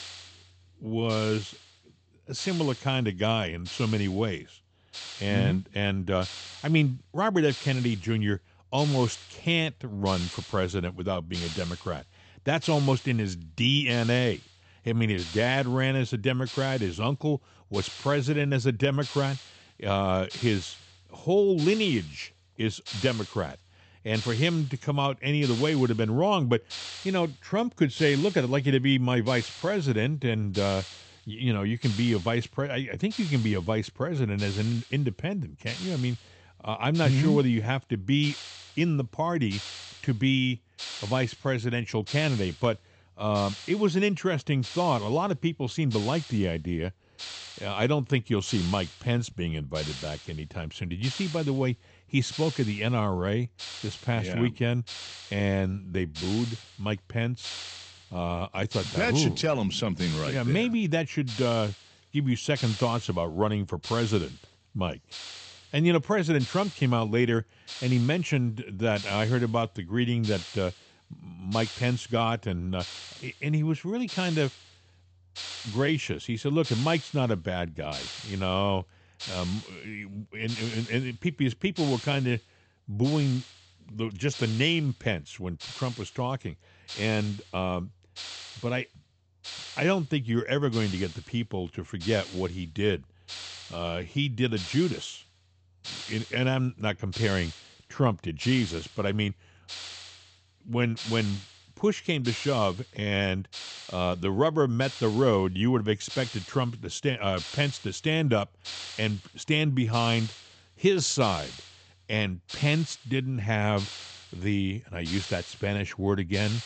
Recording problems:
high frequencies cut off; noticeable; nothing above 8 kHz
hiss; noticeable; throughout; 10 dB below the speech

